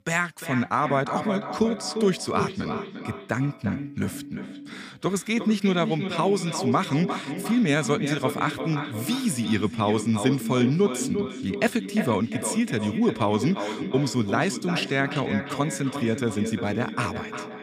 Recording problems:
echo of what is said; strong; throughout; 350 ms later, 7 dB below the speech
background music; faint; throughout; 25 dB below the speech

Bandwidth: 15 kHz